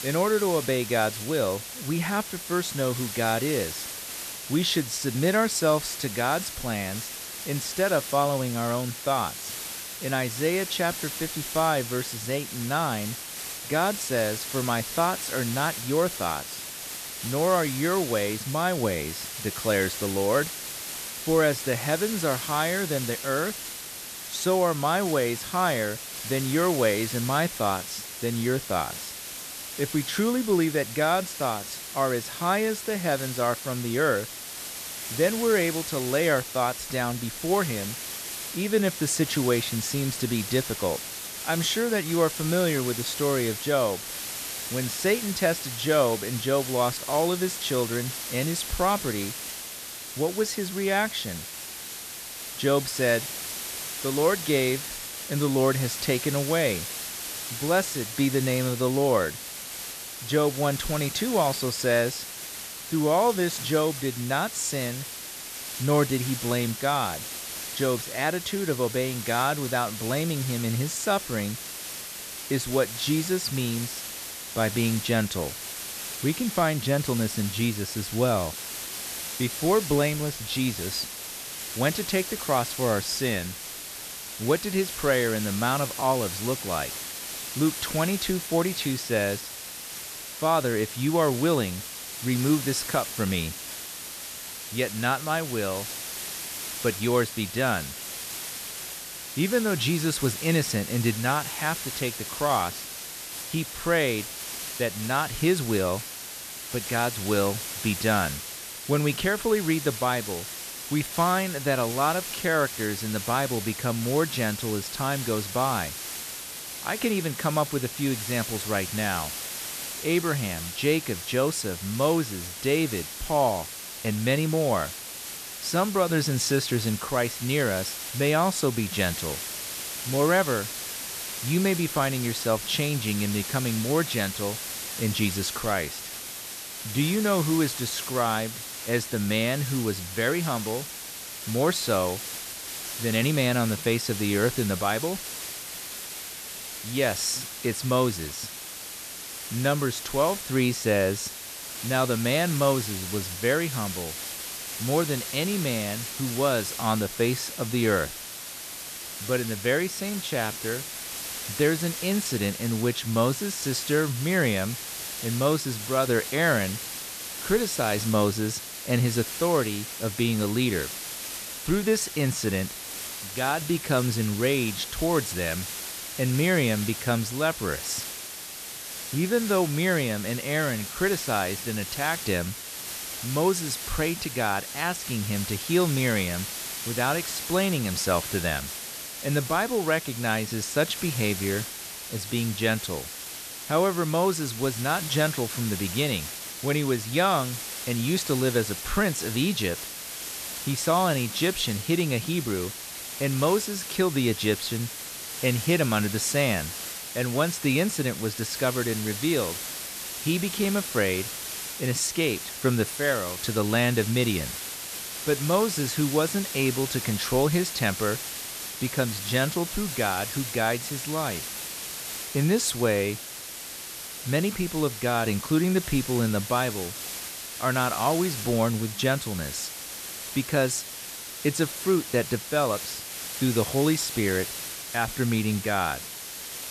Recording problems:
hiss; loud; throughout; 7 dB below the speech

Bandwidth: 14 kHz